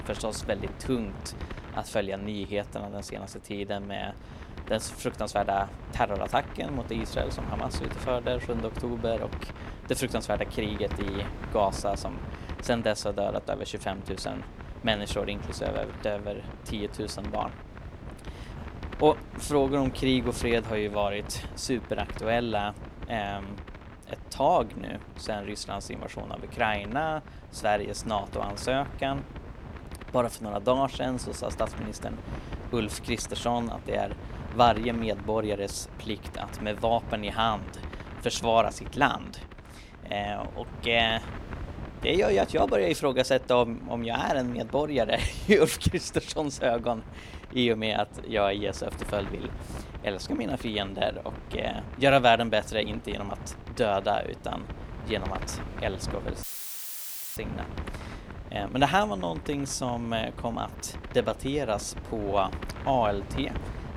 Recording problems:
wind noise on the microphone; occasional gusts; 15 dB below the speech
audio cutting out; filled with static; at 56 s for 1 s

